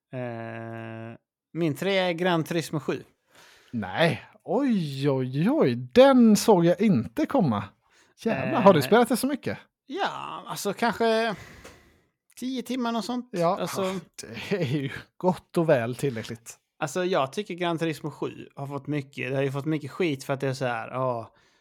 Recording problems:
none

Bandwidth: 18 kHz